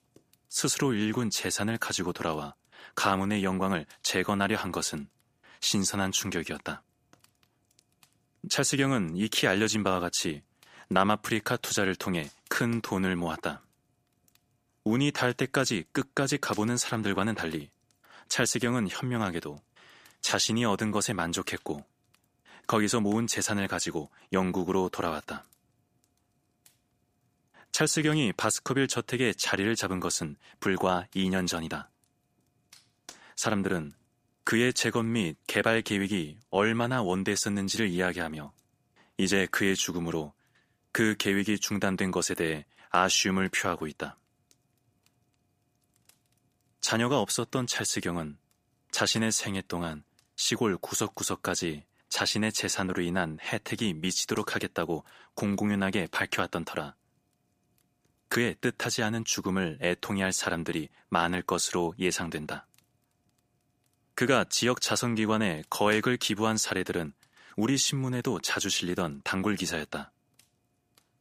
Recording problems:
none

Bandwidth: 15 kHz